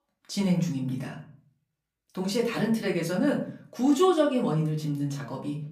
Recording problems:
off-mic speech; far
room echo; slight; dies away in 0.4 s

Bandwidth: 15 kHz